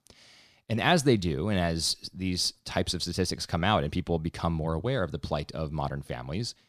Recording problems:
none

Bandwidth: 14.5 kHz